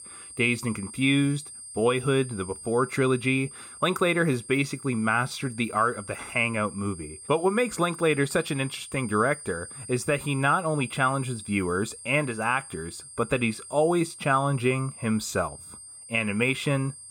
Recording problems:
high-pitched whine; noticeable; throughout; 8.5 kHz, 15 dB below the speech

